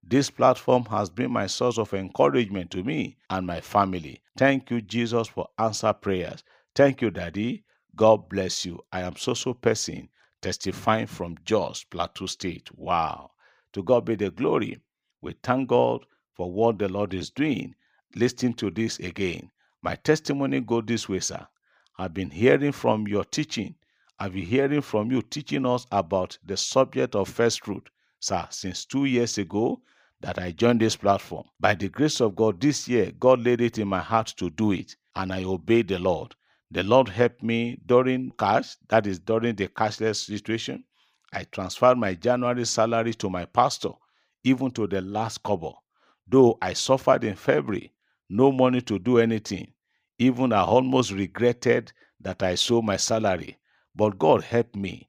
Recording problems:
none

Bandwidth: 15 kHz